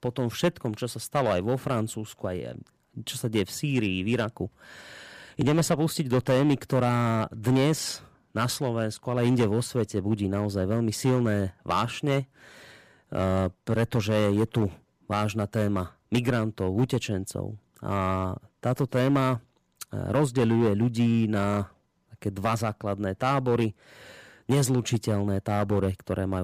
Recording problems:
distortion; slight; 4% of the sound clipped
abrupt cut into speech; at the end

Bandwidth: 15 kHz